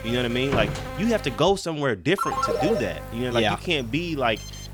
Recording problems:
electrical hum; noticeable; until 1.5 s and from 2.5 s on; 50 Hz, 10 dB below the speech
door banging; noticeable; at 0.5 s; peak 4 dB below the speech
phone ringing; loud; at 2 s; peak 1 dB above the speech
alarm; very faint; at 4.5 s; peak 15 dB below the speech

